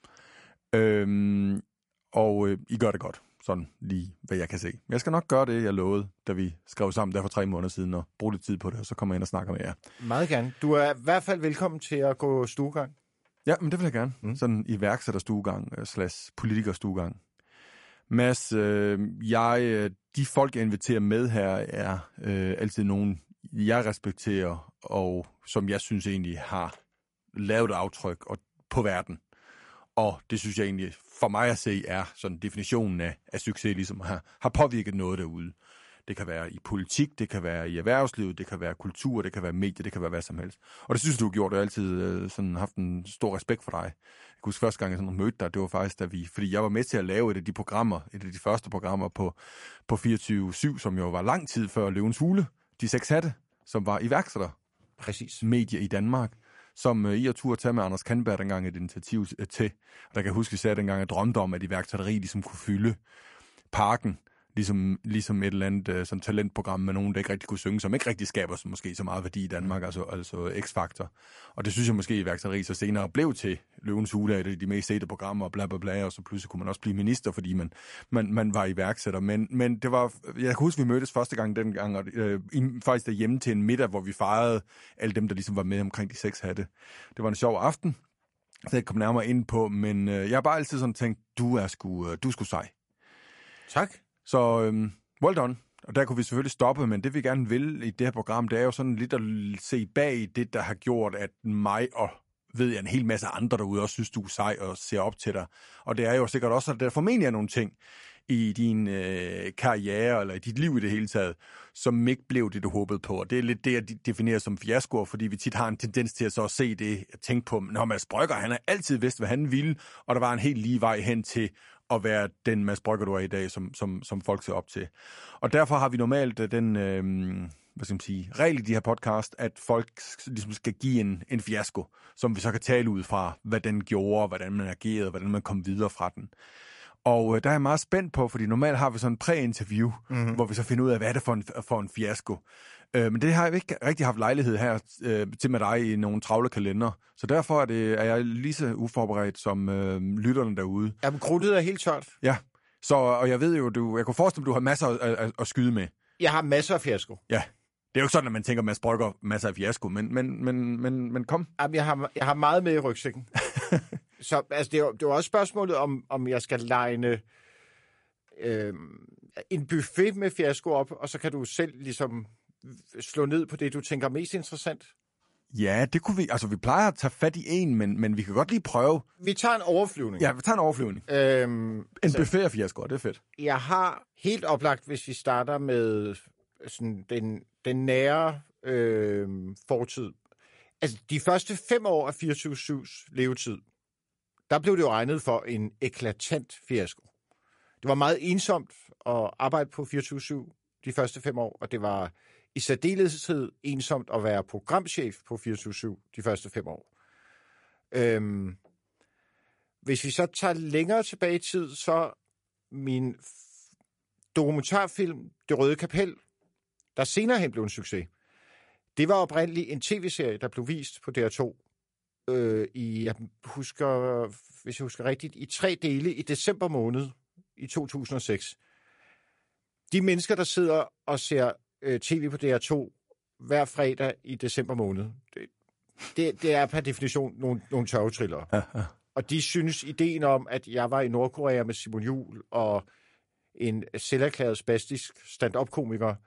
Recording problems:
garbled, watery; slightly; nothing above 11 kHz

